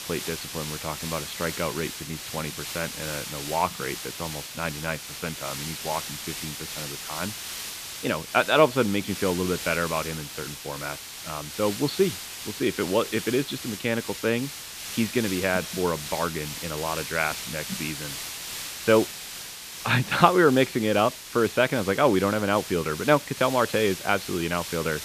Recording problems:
high frequencies cut off; severe; nothing above 4.5 kHz
hiss; loud; throughout; 8 dB below the speech

